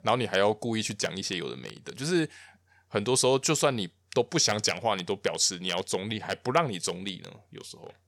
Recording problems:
none

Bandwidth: 18 kHz